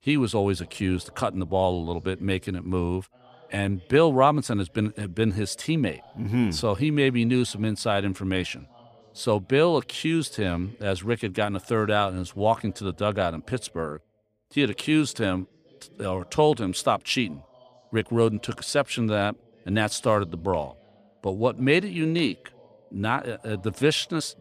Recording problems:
voice in the background; faint; throughout; 30 dB below the speech

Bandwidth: 15 kHz